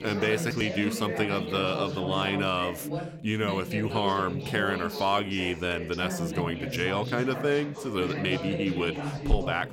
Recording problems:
background chatter; loud; throughout; 4 voices, 5 dB below the speech

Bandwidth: 16.5 kHz